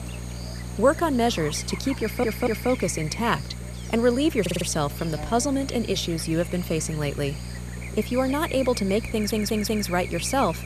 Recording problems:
electrical hum; noticeable; throughout; 60 Hz, 10 dB below the speech
audio stuttering; at 2 s, at 4.5 s and at 9 s

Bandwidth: 14.5 kHz